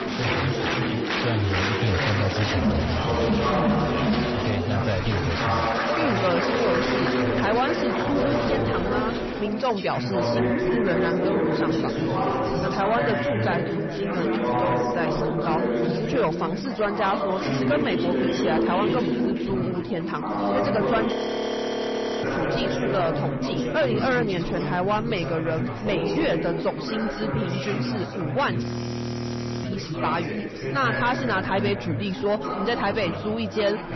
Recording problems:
distortion; slight; 10 dB below the speech
garbled, watery; slightly; nothing above 6 kHz
chatter from many people; very loud; throughout; 2 dB above the speech
audio freezing; at 21 s for 1 s and at 29 s for 1 s

